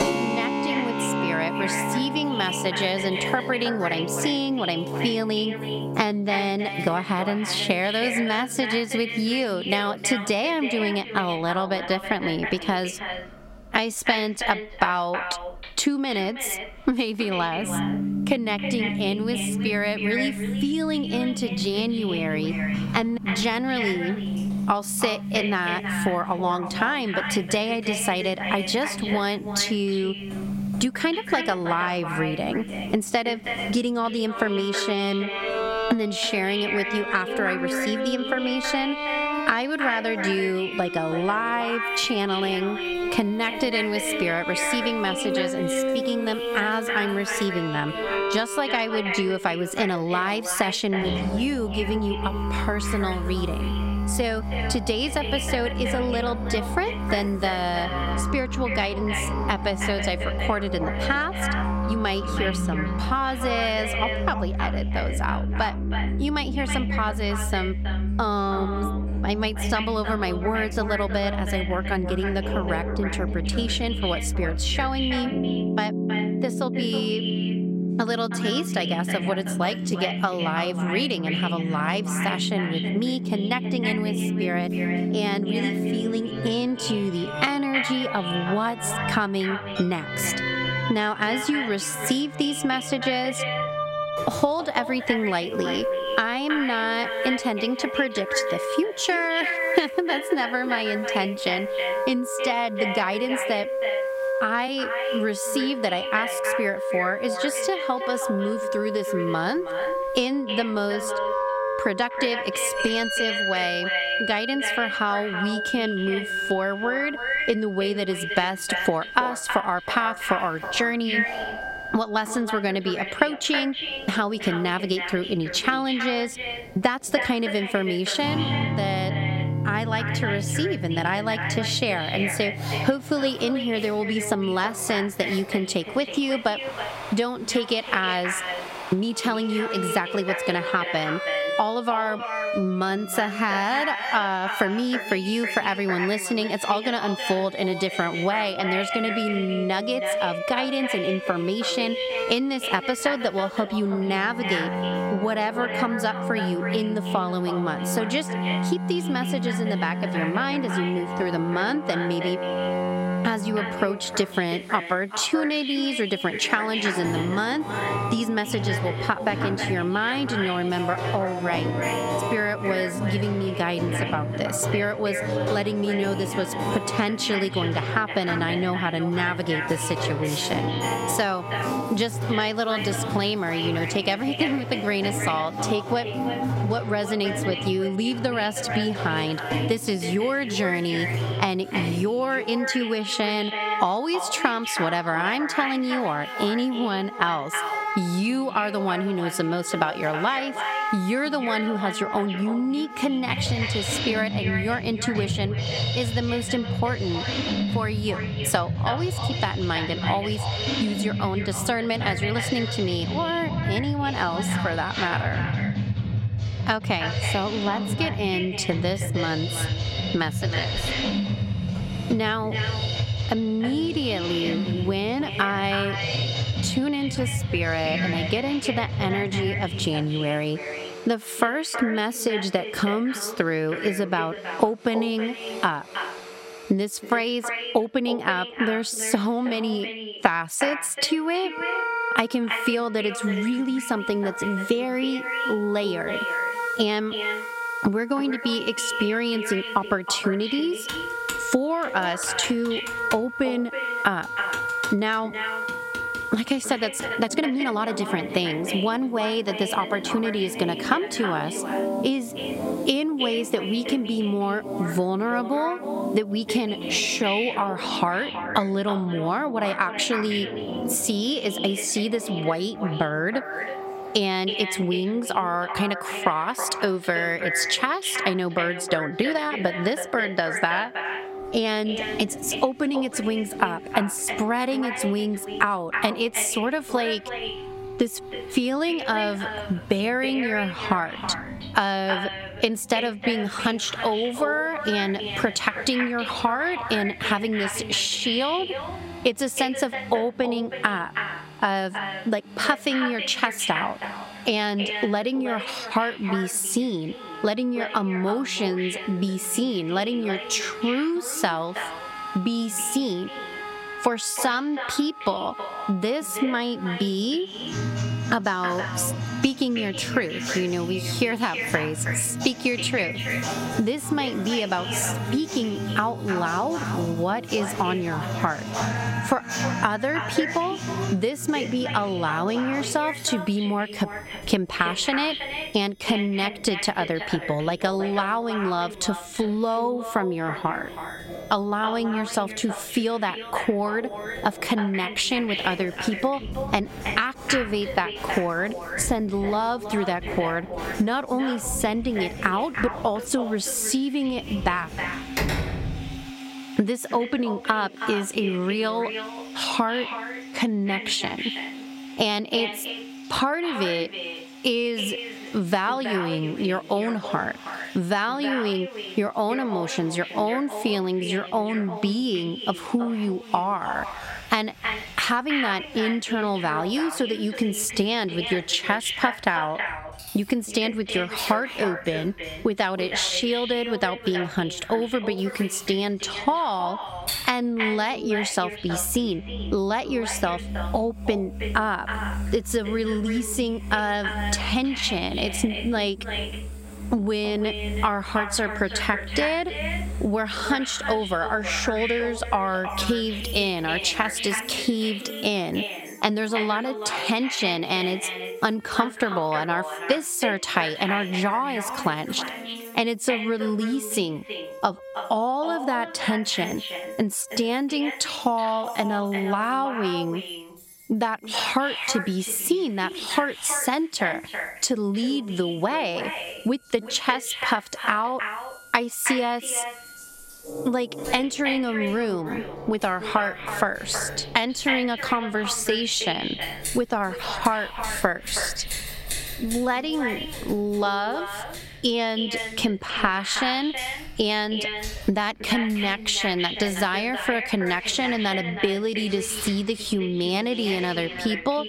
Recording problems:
echo of what is said; strong; throughout; 320 ms later, 7 dB below the speech
squashed, flat; somewhat, background pumping
background music; loud; throughout; 5 dB below the speech
household noises; faint; throughout; 20 dB below the speech
uneven, jittery; strongly; from 1:03 to 7:08
door banging; faint; from 3:41 to 3:42; peak 15 dB below the speech
keyboard typing; noticeable; from 4:11 to 4:17; peak 8 dB below the speech
door banging; loud; at 5:55; peak level with the speech

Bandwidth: 16 kHz